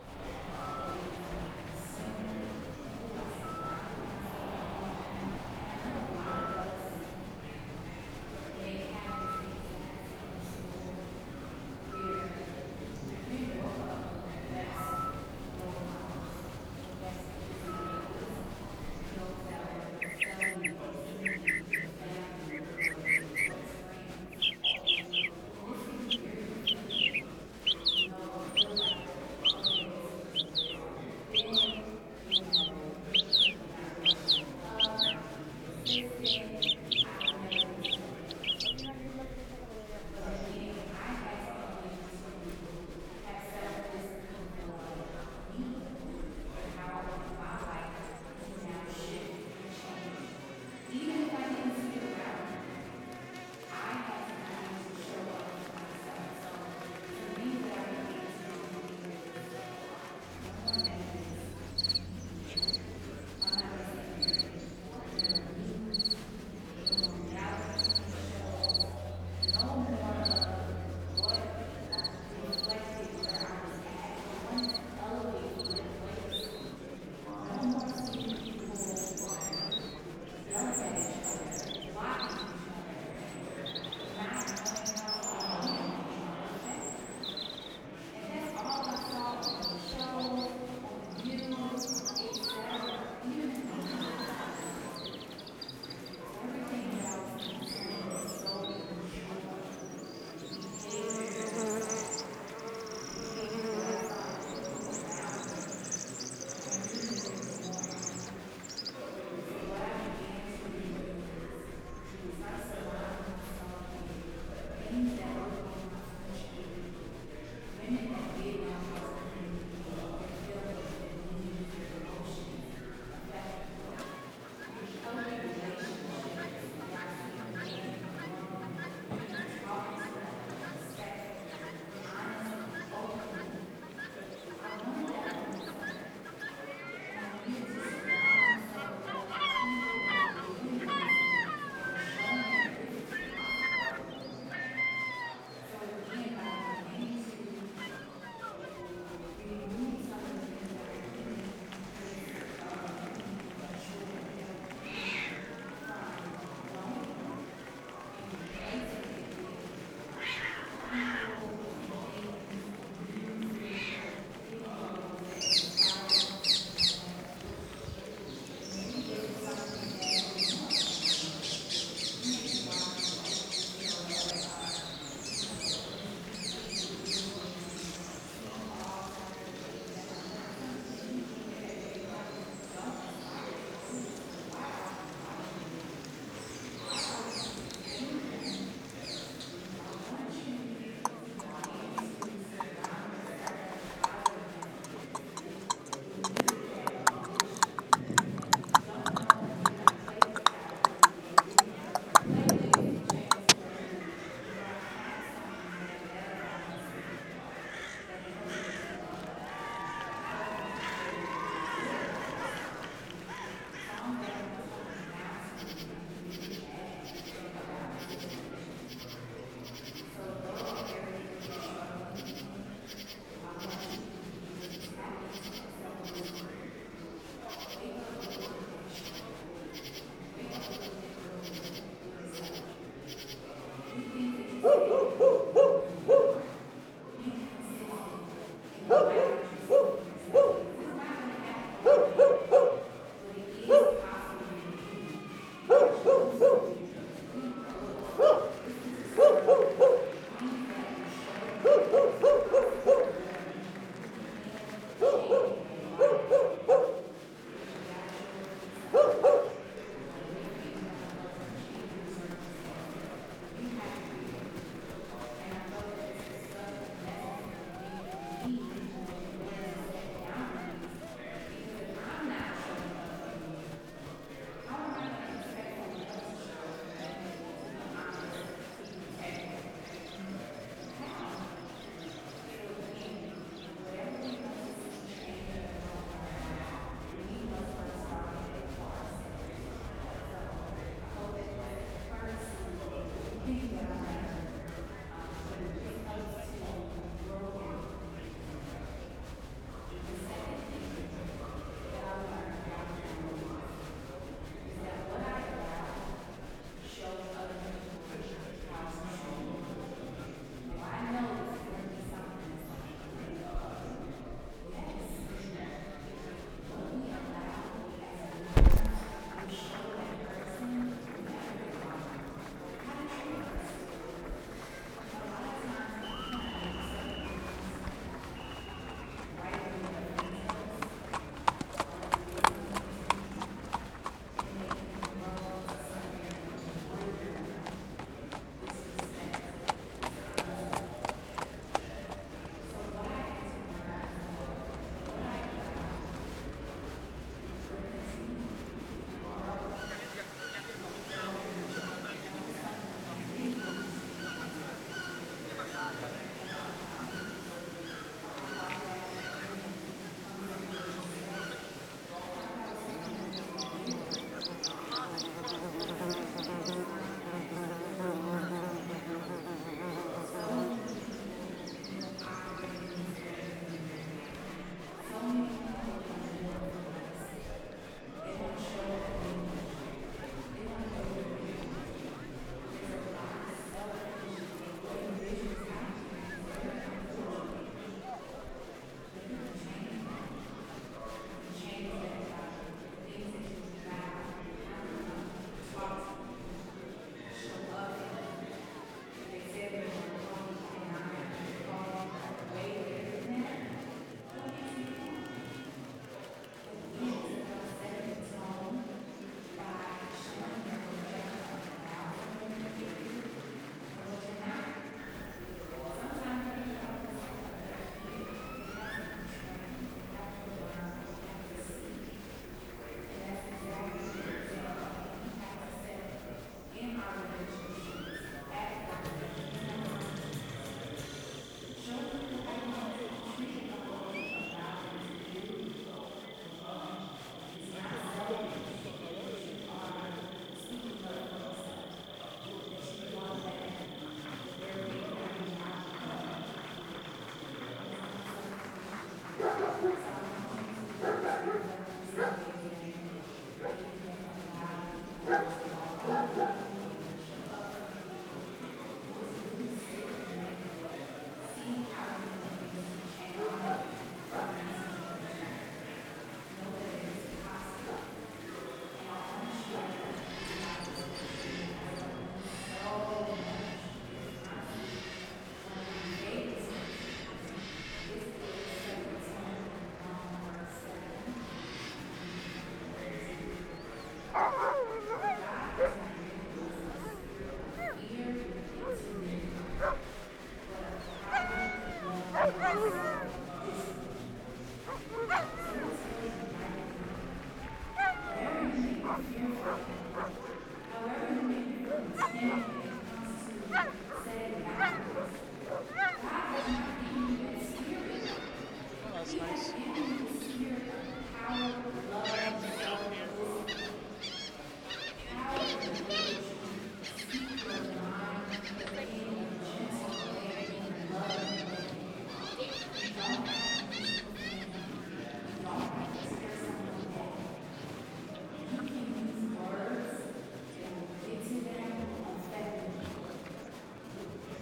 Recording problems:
room echo; strong; dies away in 2.2 s
off-mic speech; far
animal sounds; very loud; throughout; 10 dB above the speech
murmuring crowd; loud; throughout; 2 dB below the speech

